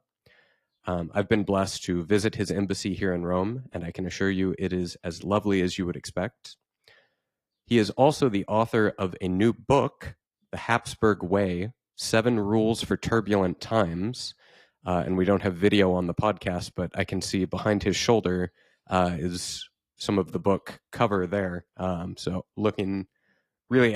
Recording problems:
garbled, watery; slightly
abrupt cut into speech; at the end

